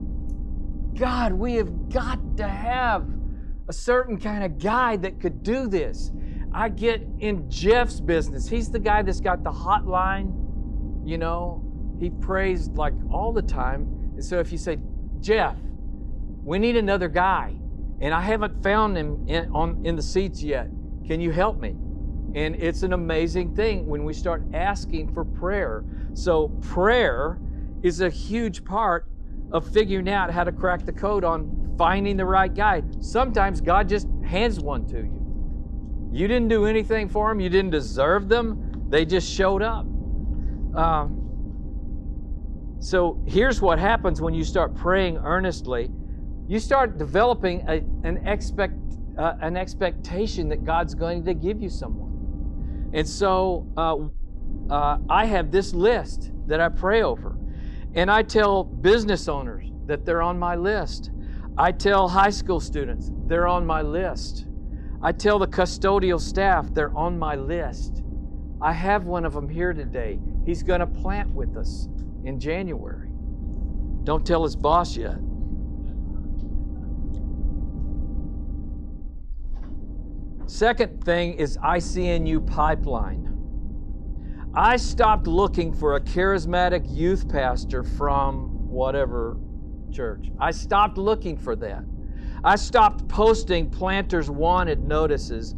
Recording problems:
low rumble; faint; throughout; 20 dB below the speech

